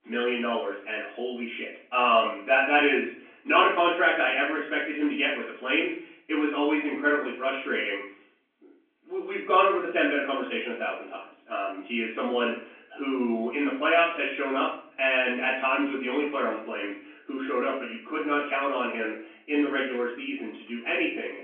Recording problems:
off-mic speech; far
room echo; noticeable; dies away in 0.6 s
phone-call audio; nothing above 3 kHz

